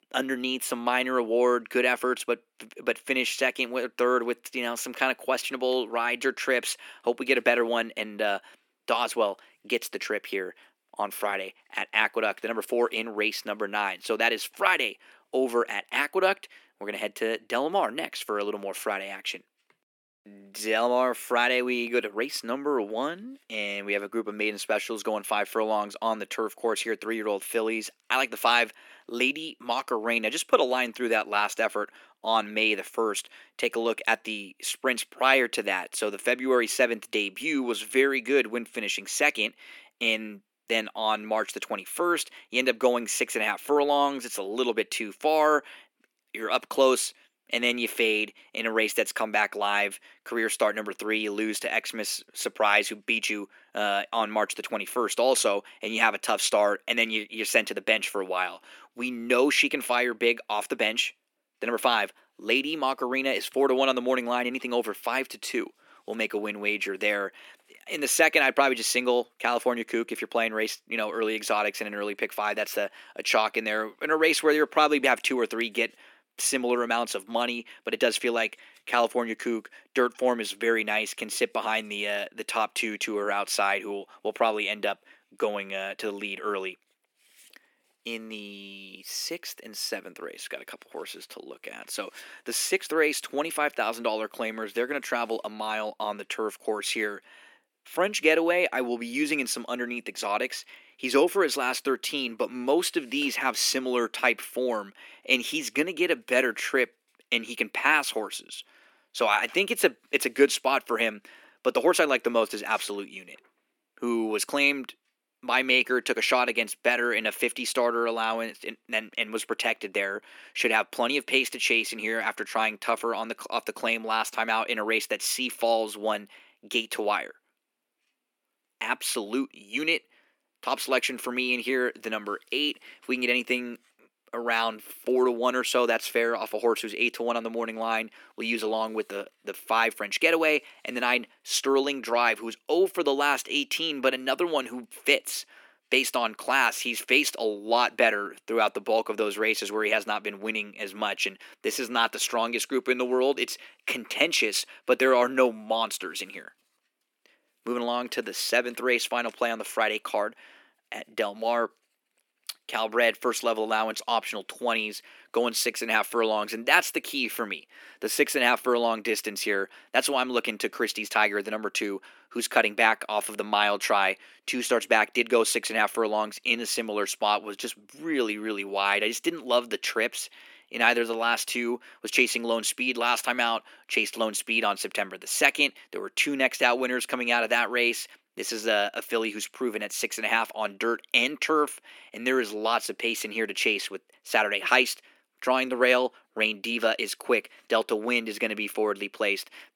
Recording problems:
thin; somewhat; fading below 250 Hz

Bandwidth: 18 kHz